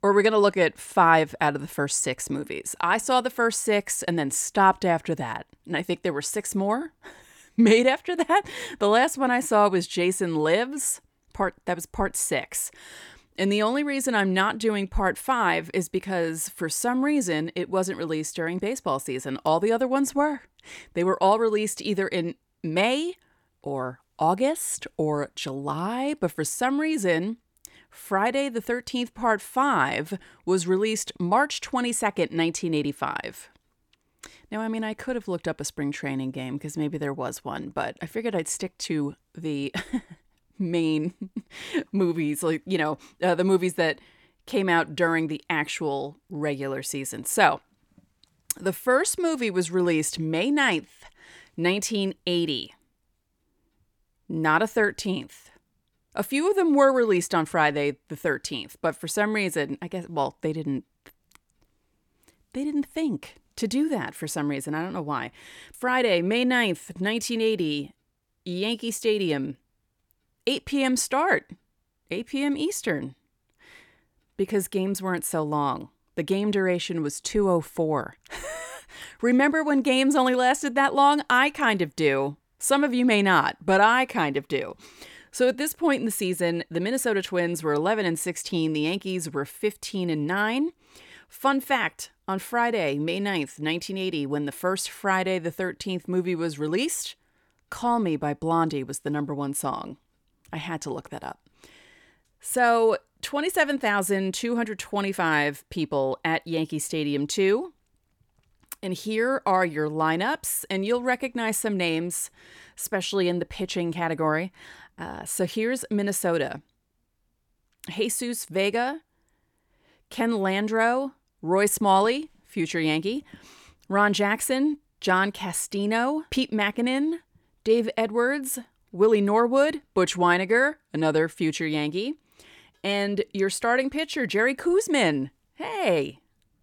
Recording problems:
none

